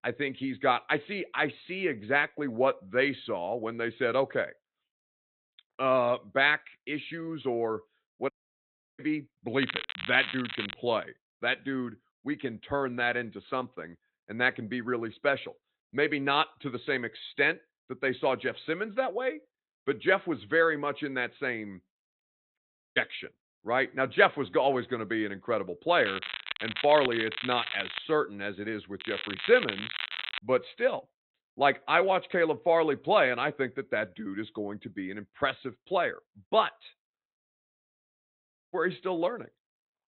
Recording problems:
high frequencies cut off; severe; nothing above 4 kHz
crackling; loud; from 9.5 to 11 s, from 26 to 28 s and from 29 to 30 s; 6 dB below the speech
audio cutting out; at 8.5 s for 0.5 s, at 23 s and at 37 s for 1.5 s

